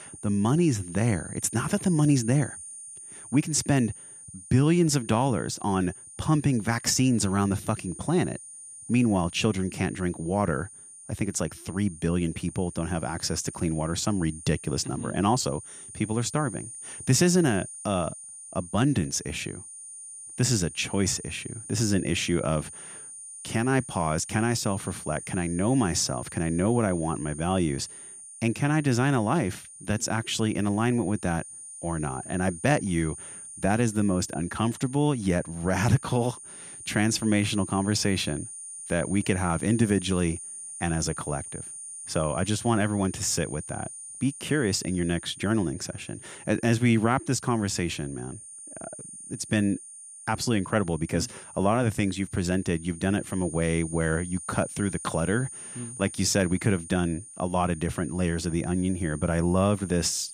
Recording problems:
high-pitched whine; noticeable; throughout; 9 kHz, 15 dB below the speech

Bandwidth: 14.5 kHz